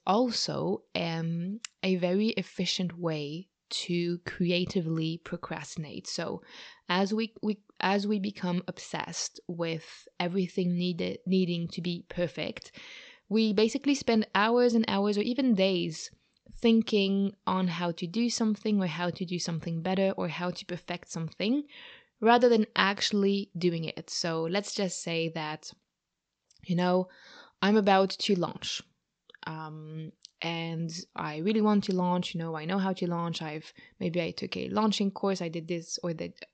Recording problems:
high frequencies cut off; noticeable; nothing above 8 kHz

